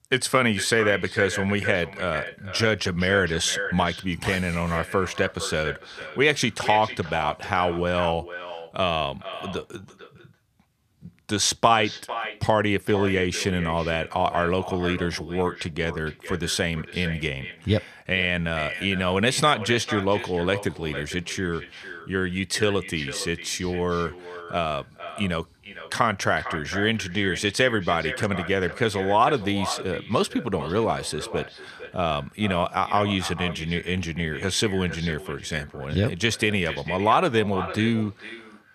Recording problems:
echo of what is said; strong; throughout; 450 ms later, 10 dB below the speech

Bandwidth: 14.5 kHz